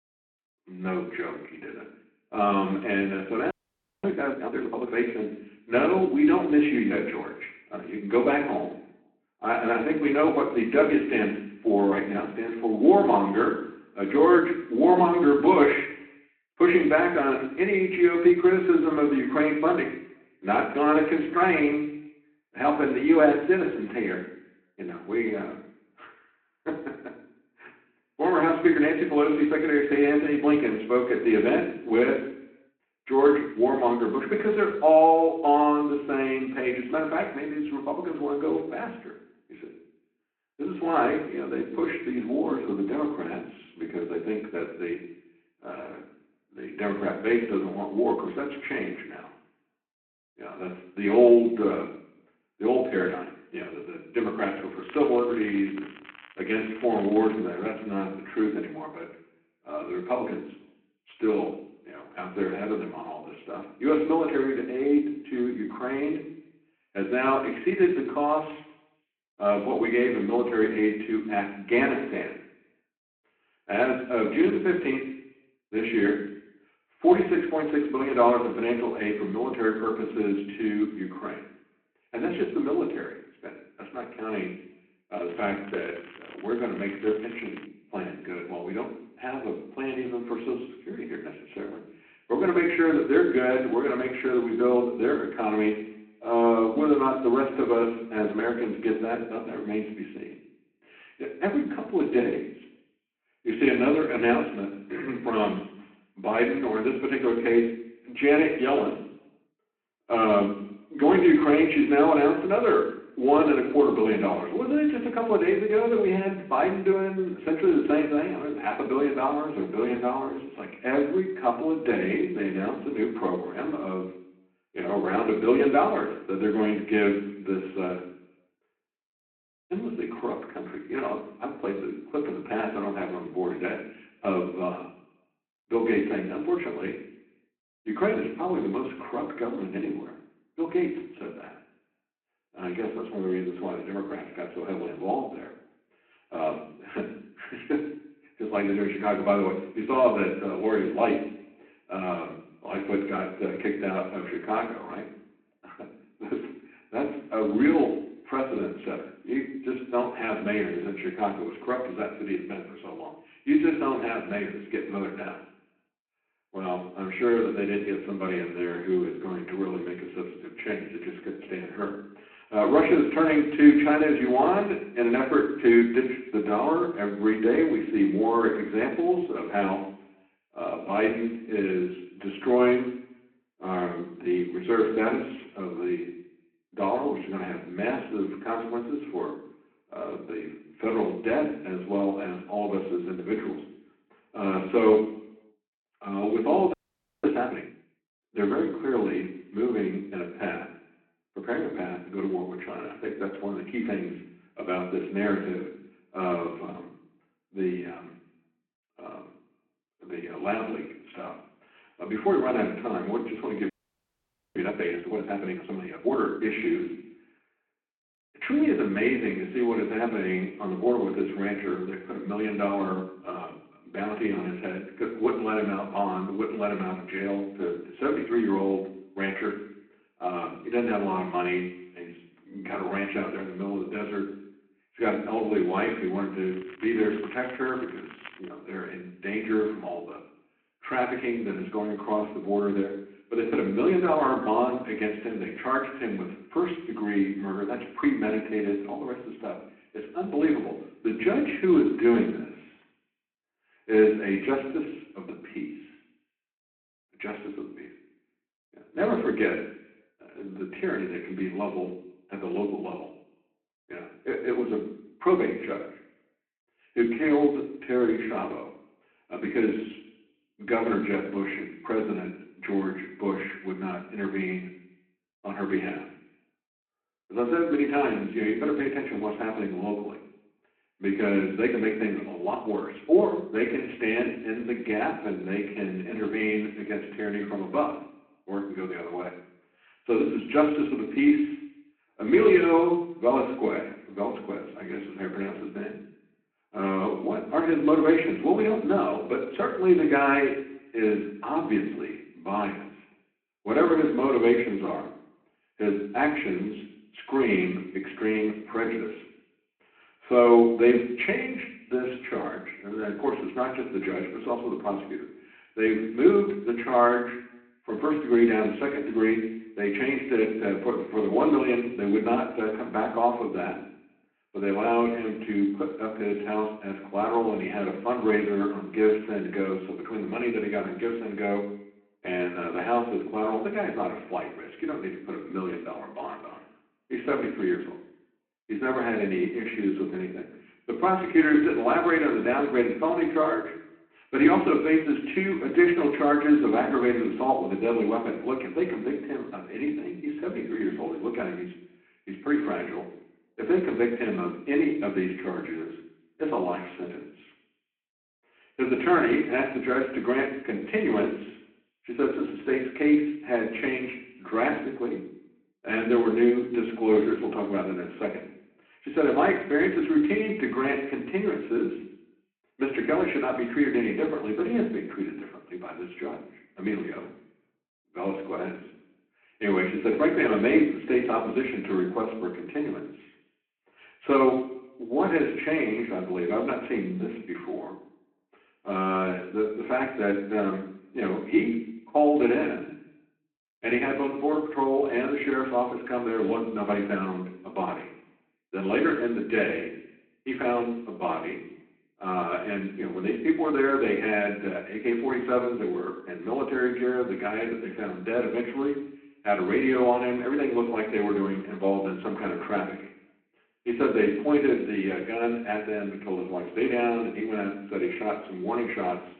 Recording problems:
room echo; slight; dies away in 0.8 s
phone-call audio; nothing above 4 kHz
off-mic speech; somewhat distant
crackling; faint; from 55 to 57 s, from 1:25 to 1:28 and from 3:56 to 3:58; 20 dB below the speech
audio freezing; at 3.5 s for 0.5 s, at 3:17 and at 3:34 for 1 s

